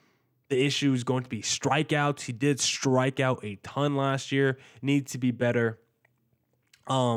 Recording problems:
abrupt cut into speech; at the end

